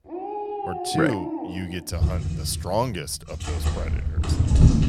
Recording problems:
animal sounds; very loud; throughout; 3 dB above the speech

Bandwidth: 18 kHz